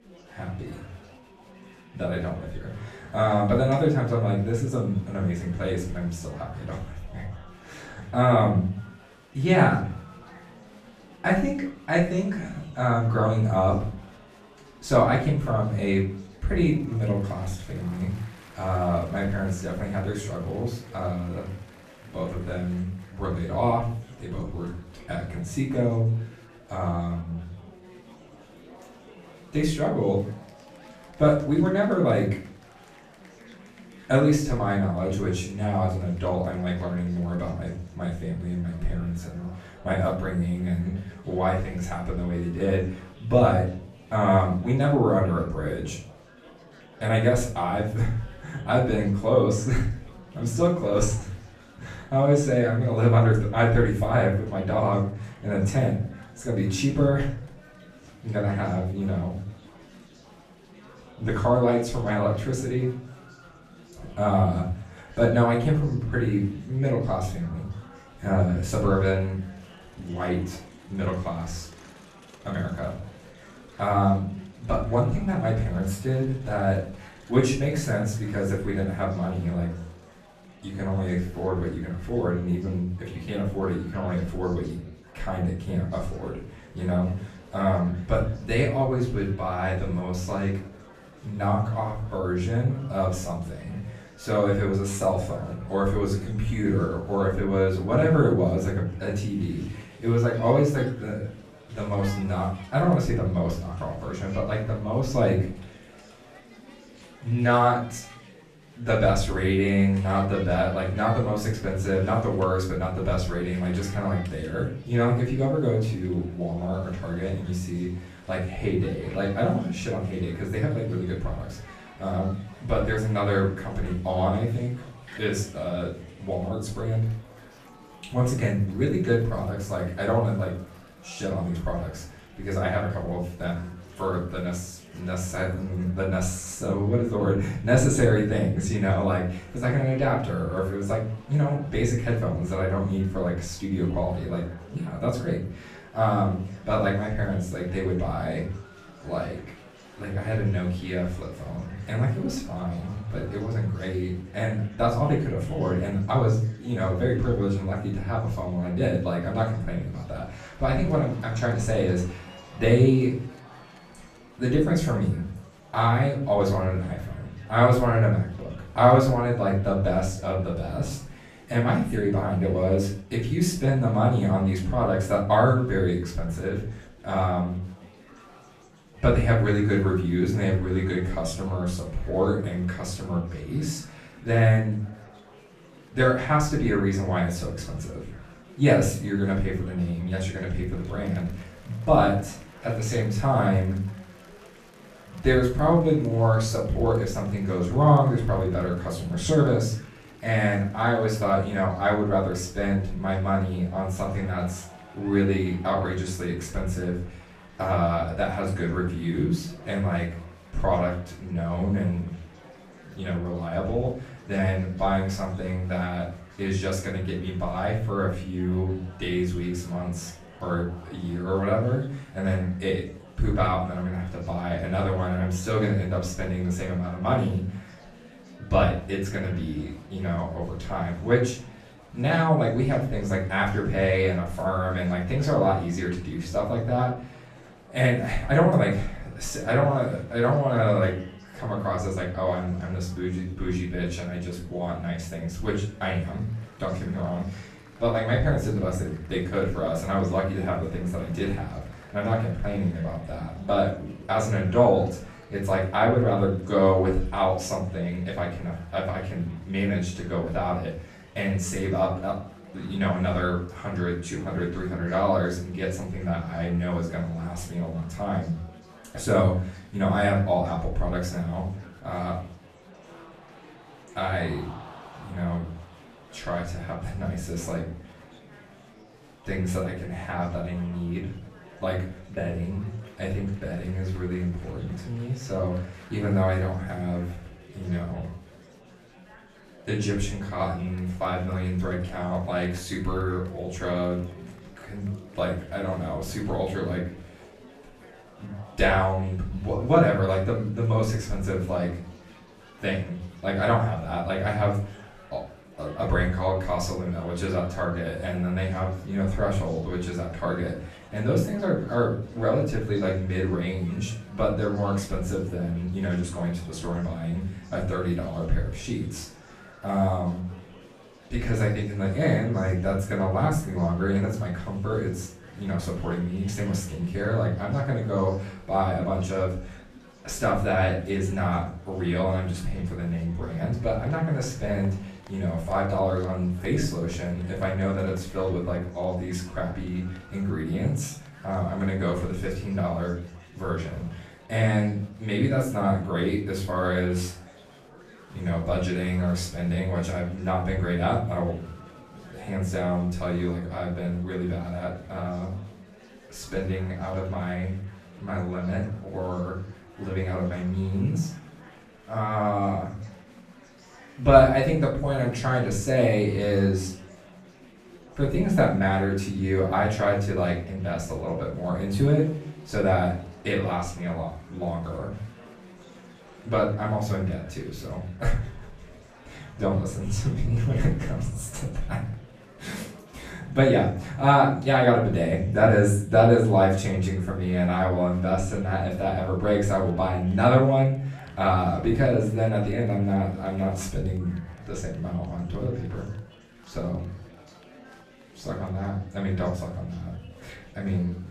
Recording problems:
off-mic speech; far
room echo; slight; dies away in 0.5 s
chatter from many people; faint; throughout; 25 dB below the speech

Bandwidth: 14.5 kHz